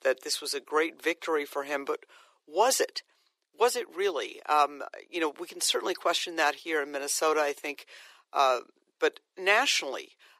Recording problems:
thin; very; fading below 350 Hz

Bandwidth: 14.5 kHz